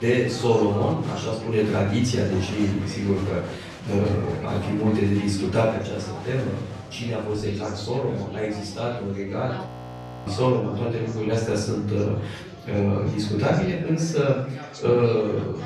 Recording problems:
off-mic speech; far
room echo; noticeable; dies away in 0.6 s
chatter from many people; noticeable; throughout; 15 dB below the speech
abrupt cut into speech; at the start
audio freezing; at 9.5 s for 0.5 s

